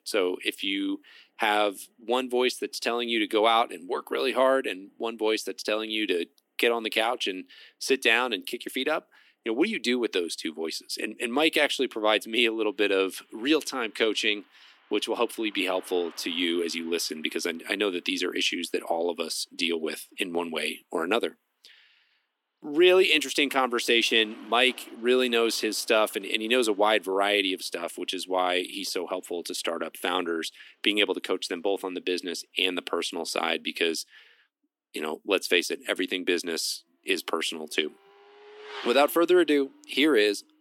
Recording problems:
thin; somewhat; fading below 300 Hz
traffic noise; faint; throughout; 25 dB below the speech

